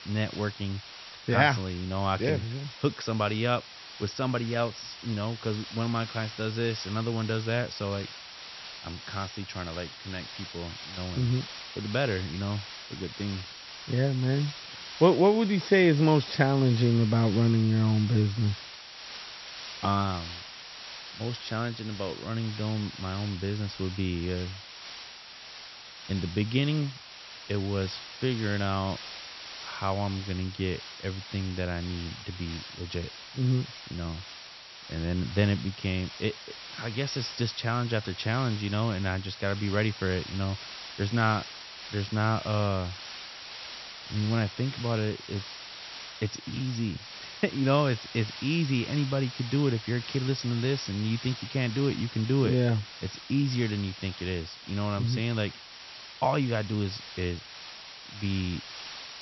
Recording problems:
high frequencies cut off; noticeable; nothing above 5.5 kHz
hiss; noticeable; throughout; 10 dB below the speech

